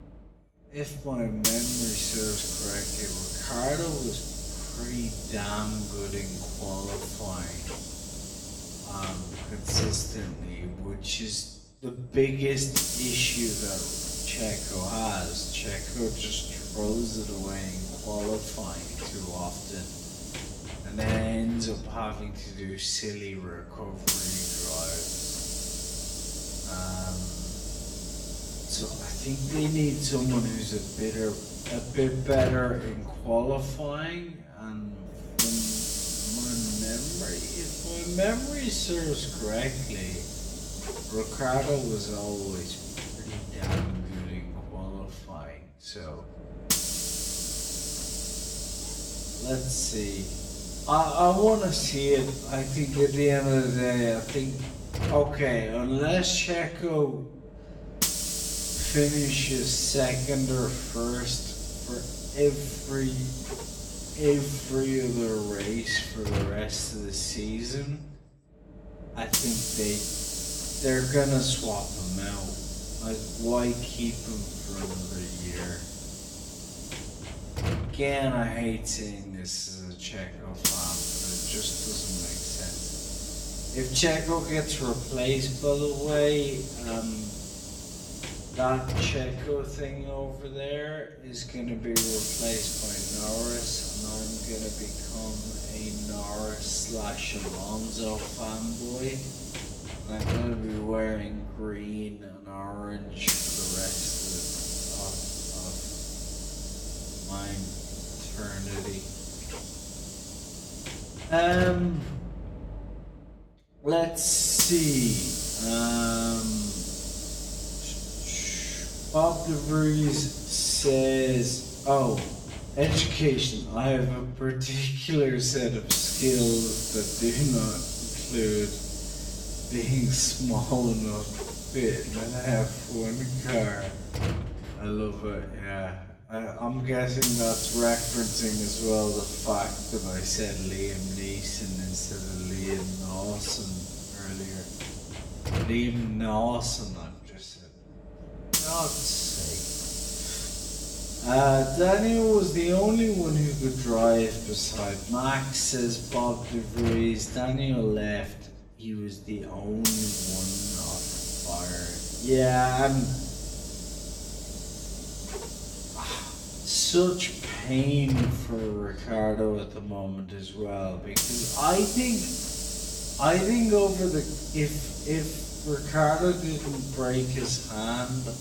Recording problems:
wrong speed, natural pitch; too slow; 0.5 times normal speed
room echo; slight; dies away in 0.6 s
off-mic speech; somewhat distant
hiss; loud; throughout; 4 dB below the speech

